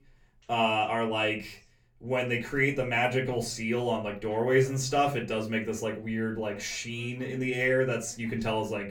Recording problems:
off-mic speech; far
room echo; very slight; dies away in 0.3 s
voice in the background; faint; throughout; 30 dB below the speech

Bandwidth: 17.5 kHz